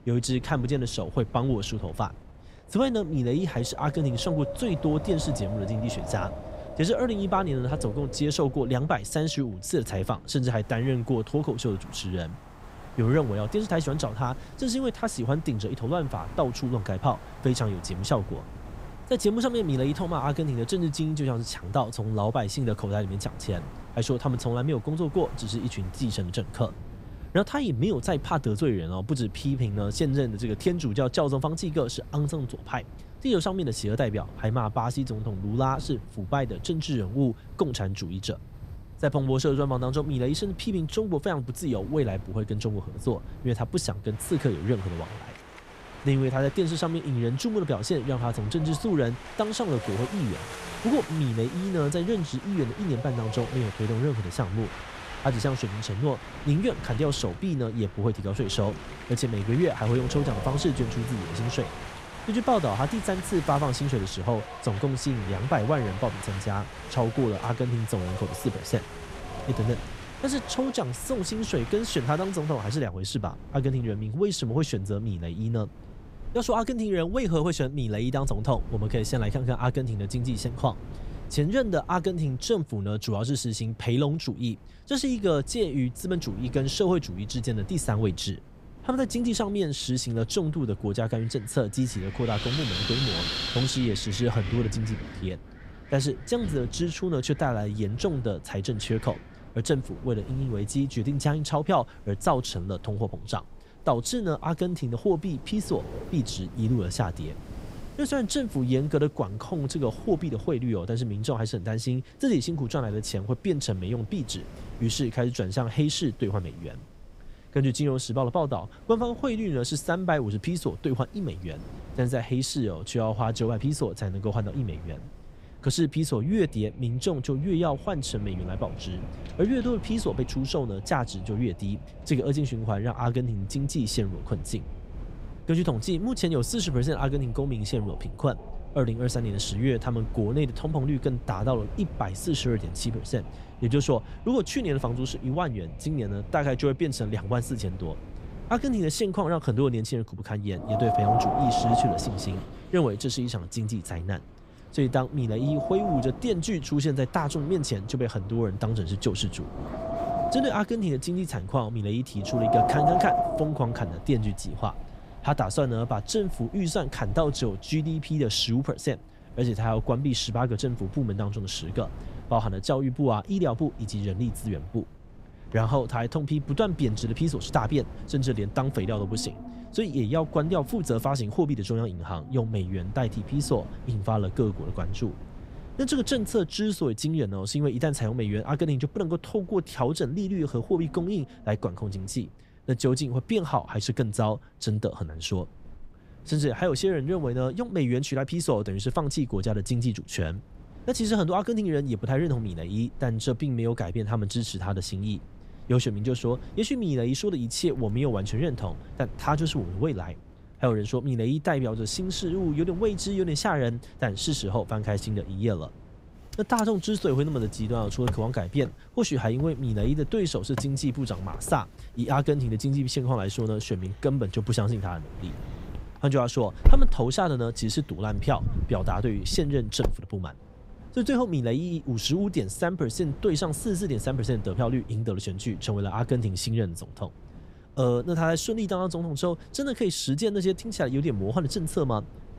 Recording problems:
wind in the background; noticeable; throughout; 10 dB below the speech

